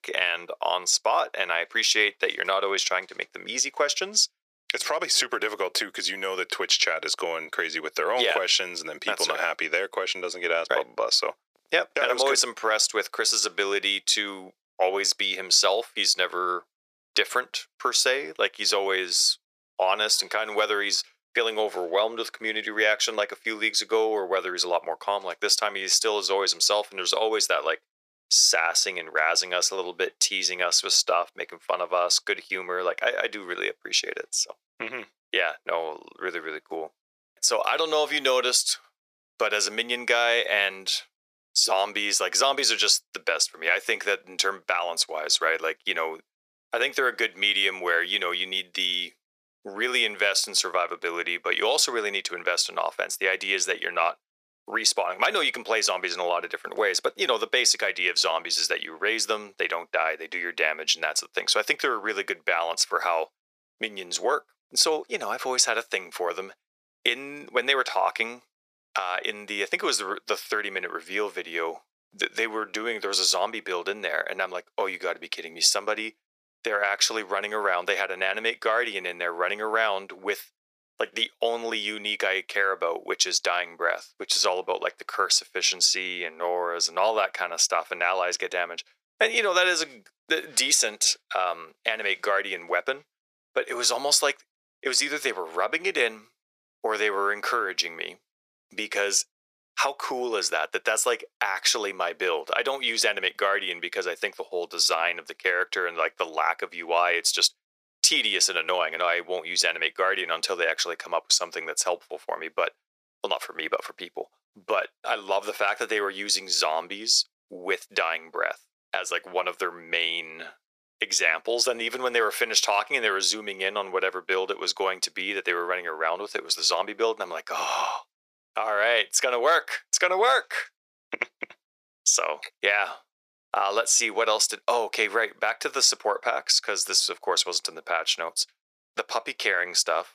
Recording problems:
thin; very; fading below 400 Hz

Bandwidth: 14.5 kHz